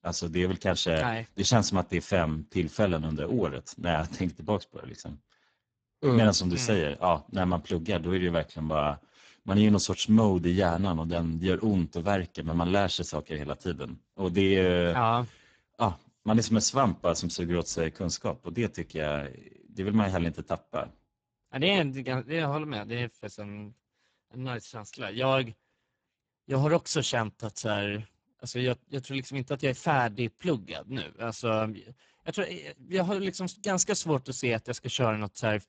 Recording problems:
garbled, watery; badly; nothing above 7.5 kHz

